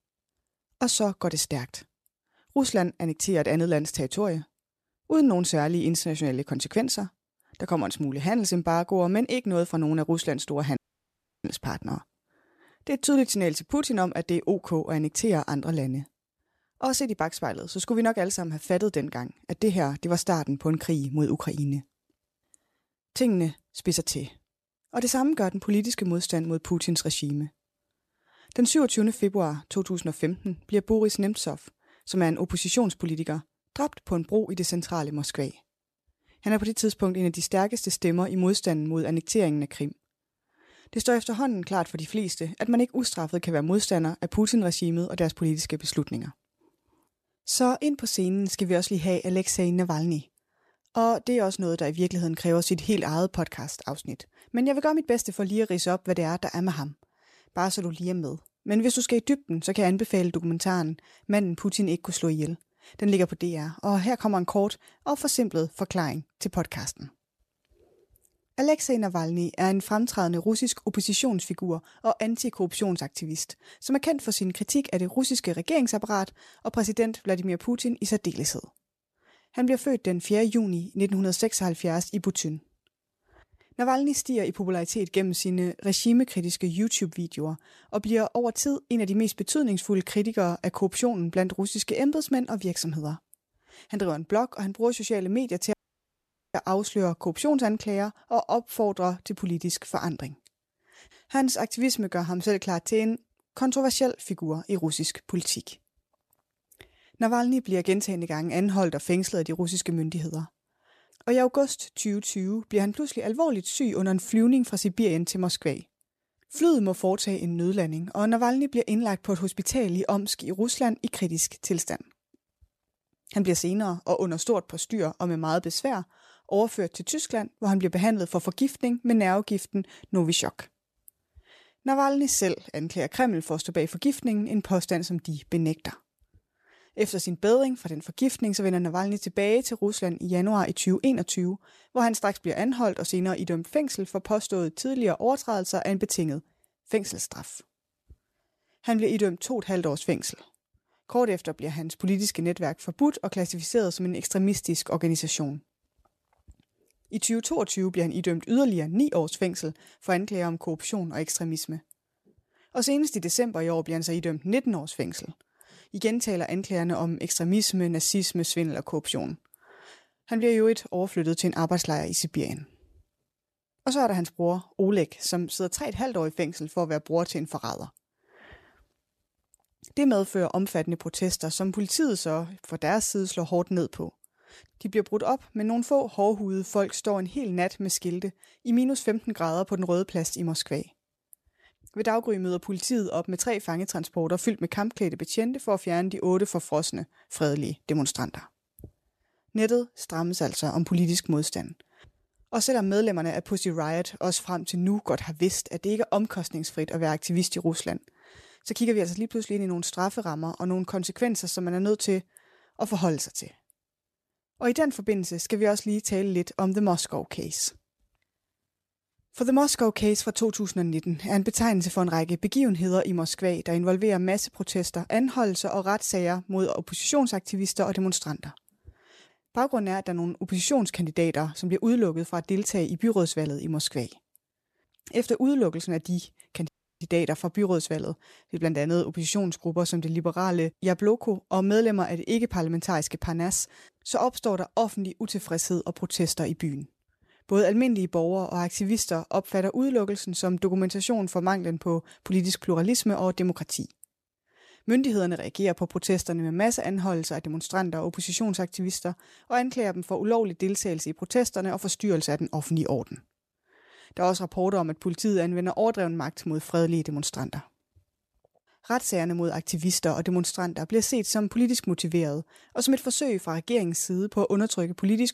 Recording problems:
audio cutting out; at 11 s for 0.5 s, at 1:36 for 1 s and at 3:57

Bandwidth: 14 kHz